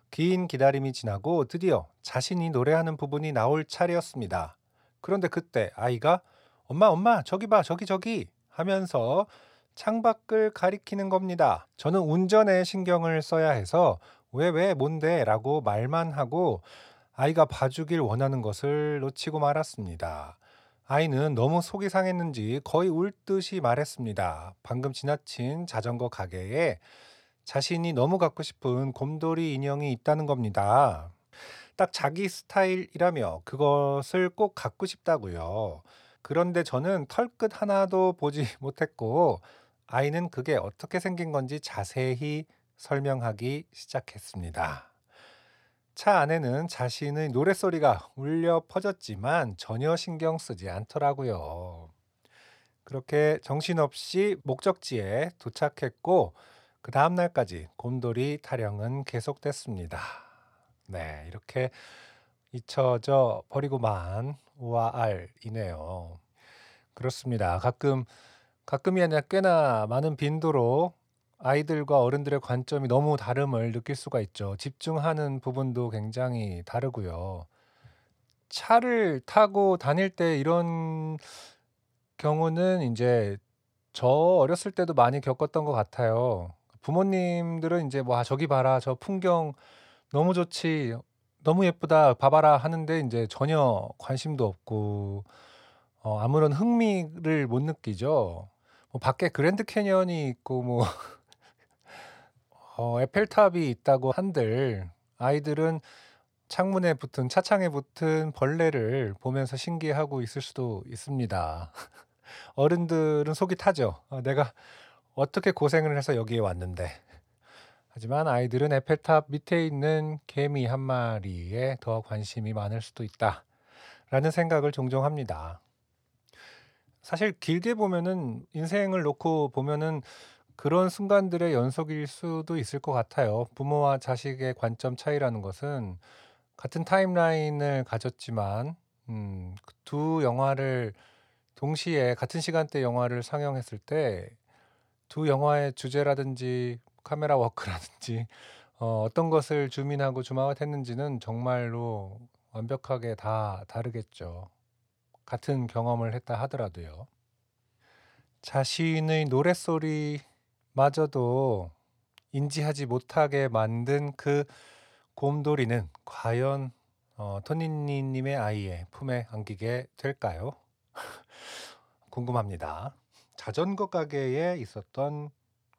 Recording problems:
none

